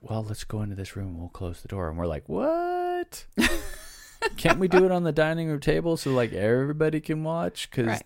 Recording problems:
none

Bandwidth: 16 kHz